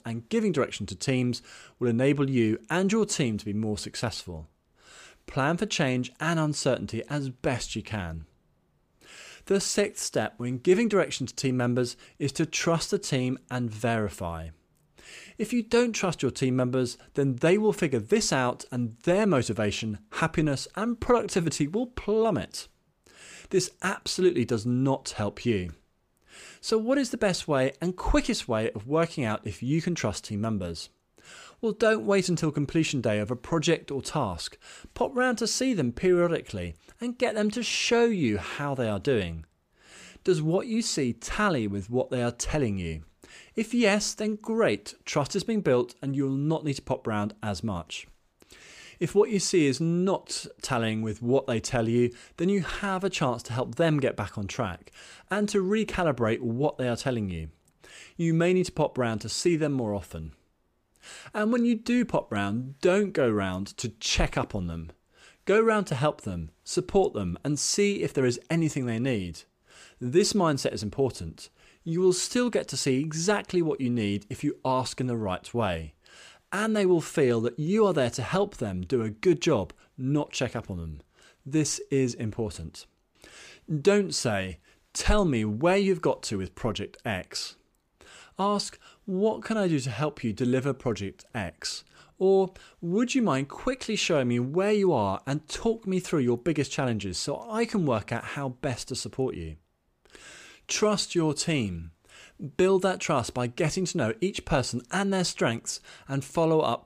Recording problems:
none

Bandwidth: 15 kHz